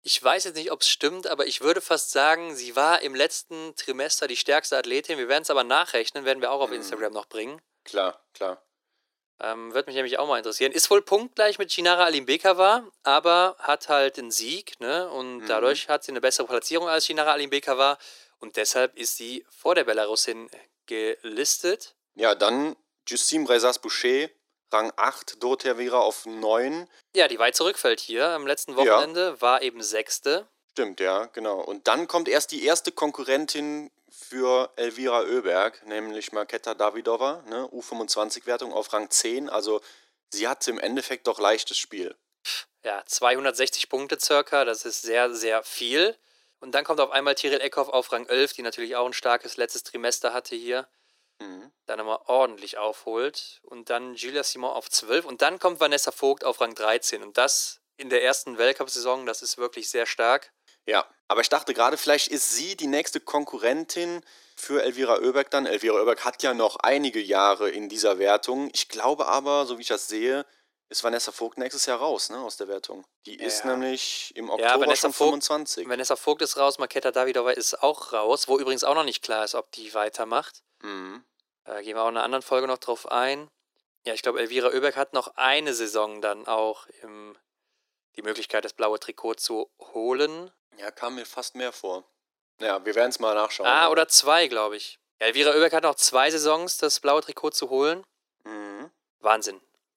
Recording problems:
thin; very; fading below 350 Hz

